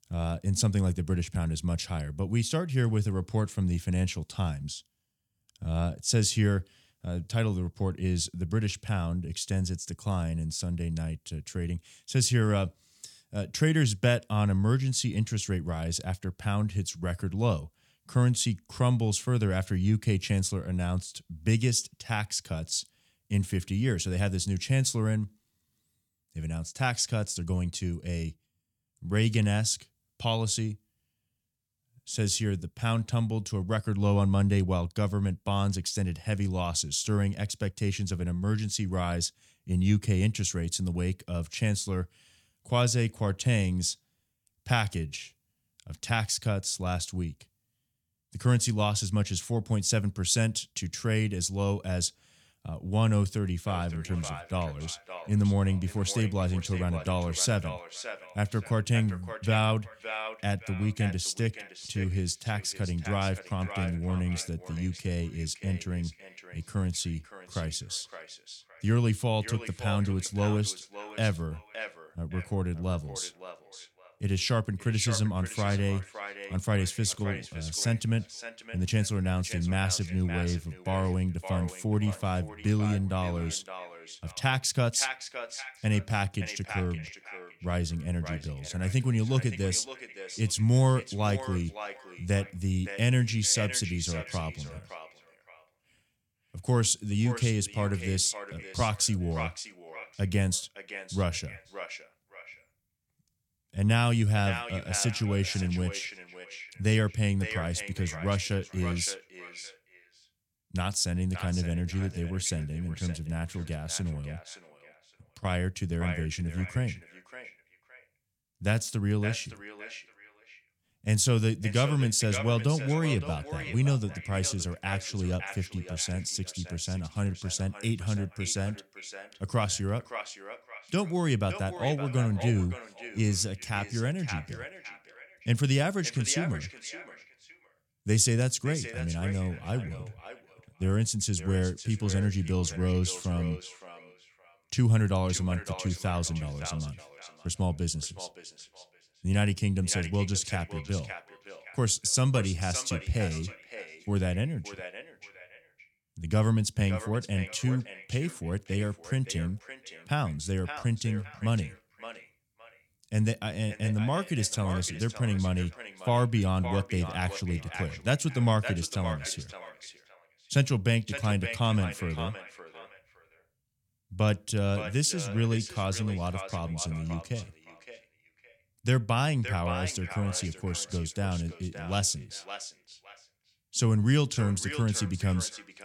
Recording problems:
echo of what is said; noticeable; from 54 s on; 570 ms later, 15 dB below the speech

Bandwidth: 17.5 kHz